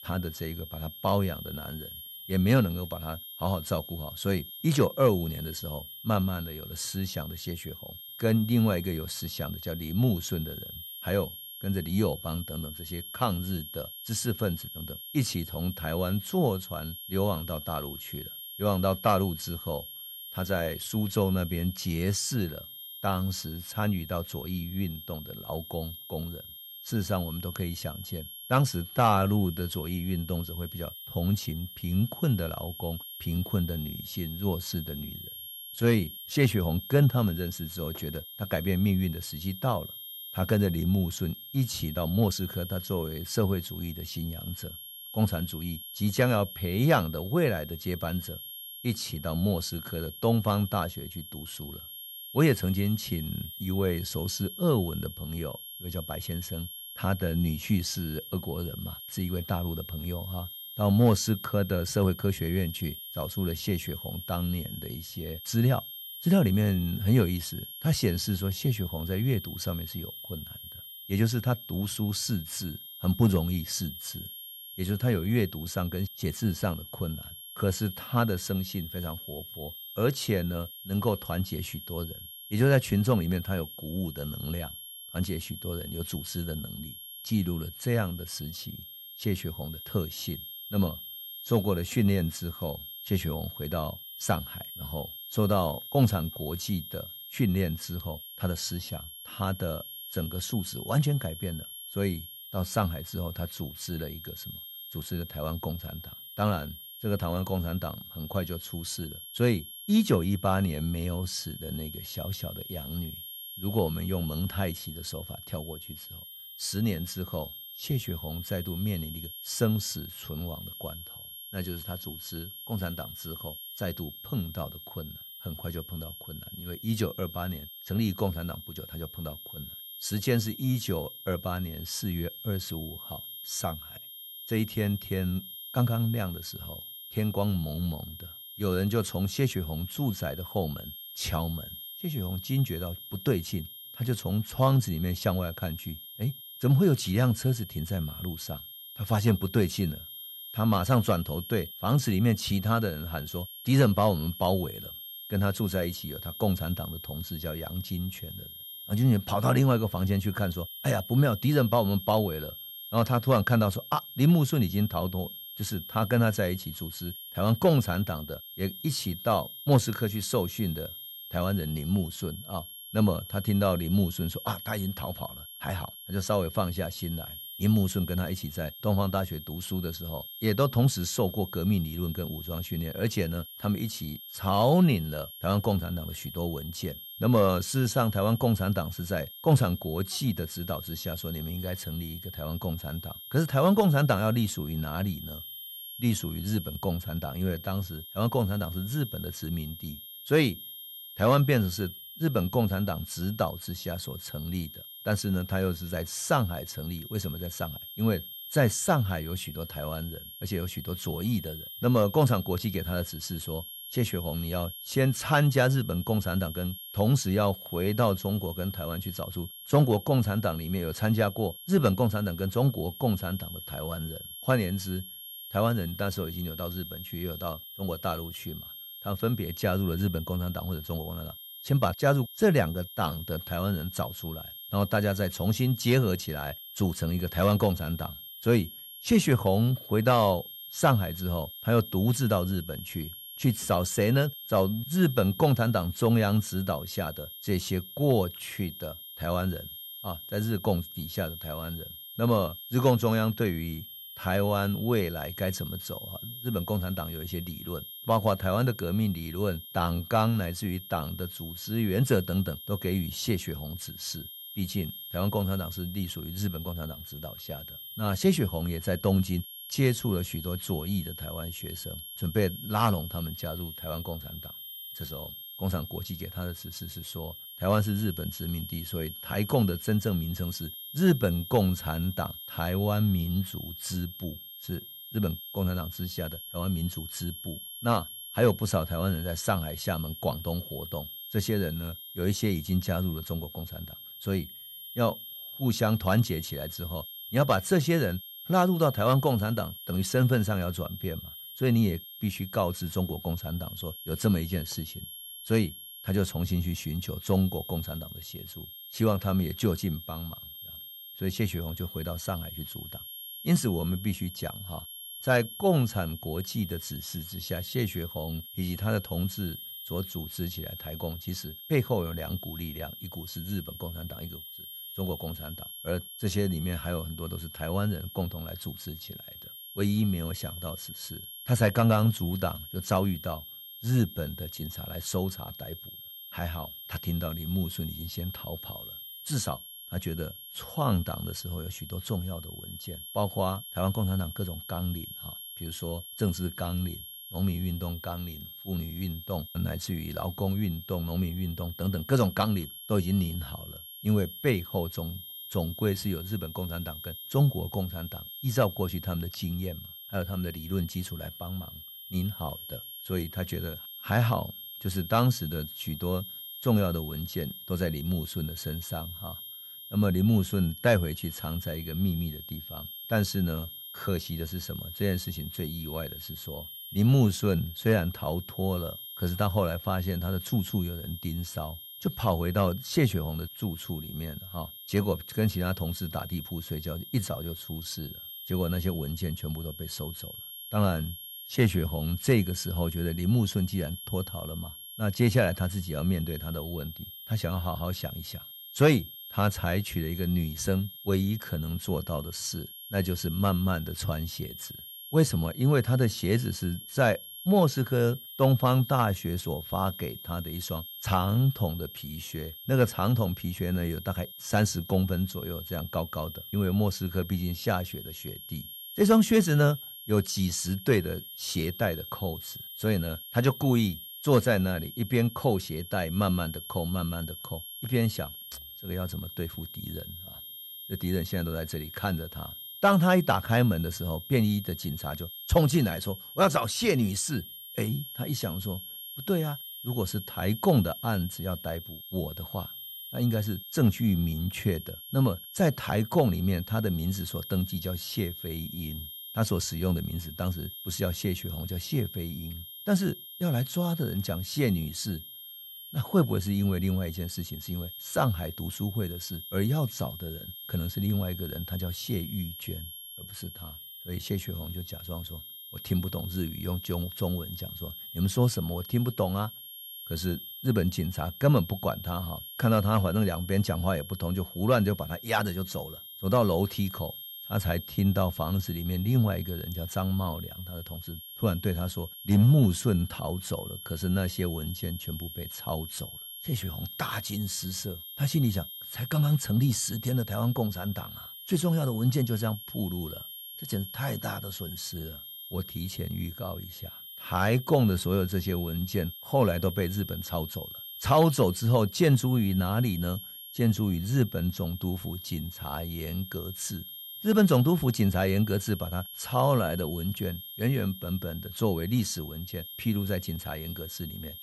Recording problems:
high-pitched whine; noticeable; throughout; 3 kHz, 10 dB below the speech
uneven, jittery; strongly; from 29 s to 7:29

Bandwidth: 14.5 kHz